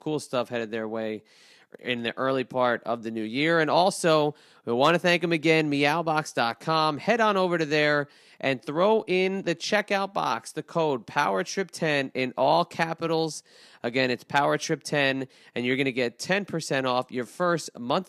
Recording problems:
none

